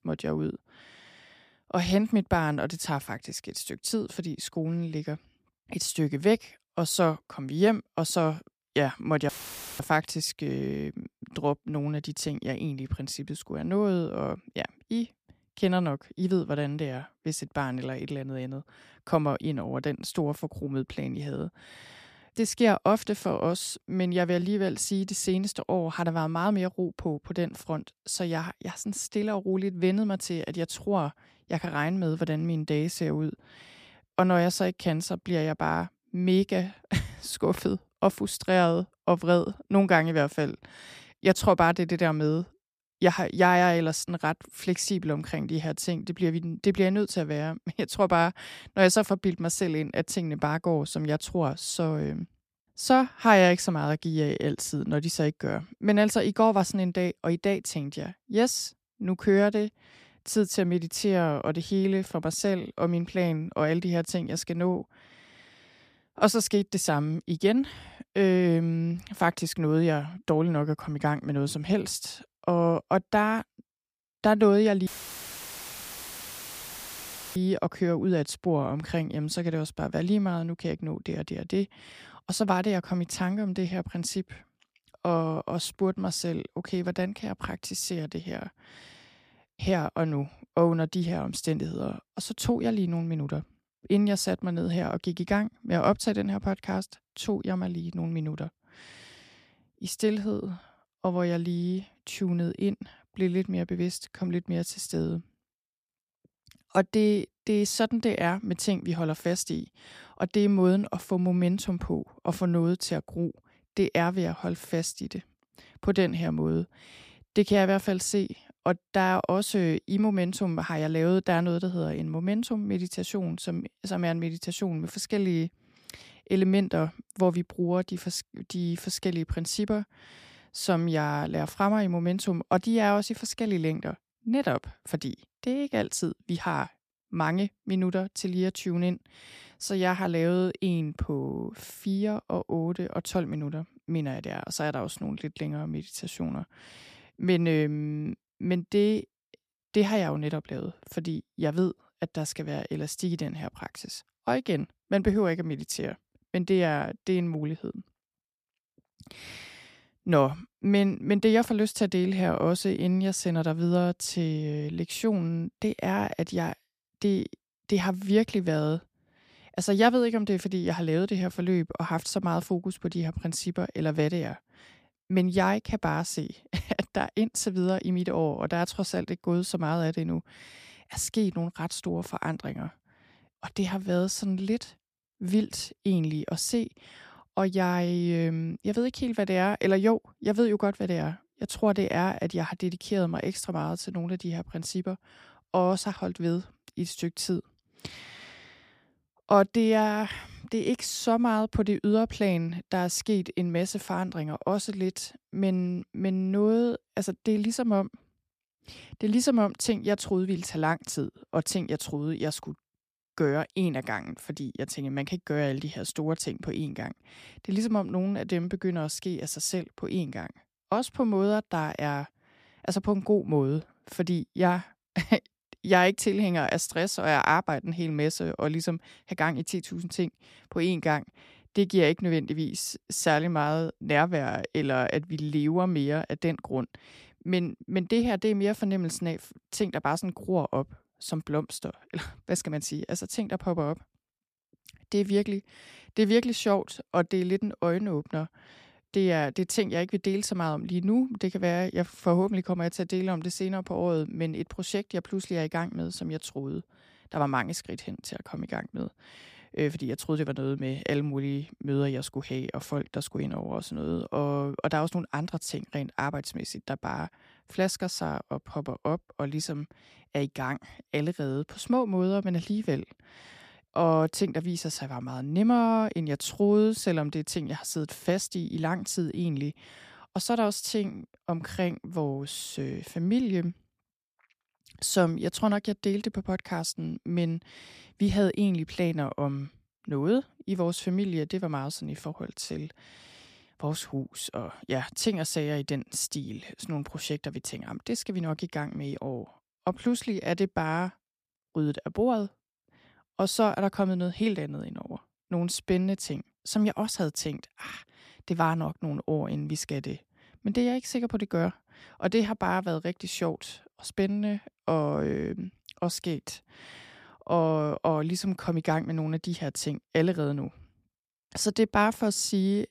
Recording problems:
audio cutting out; filled with static; at 9.5 s for 0.5 s and at 1:15 for 2.5 s

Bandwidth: 15 kHz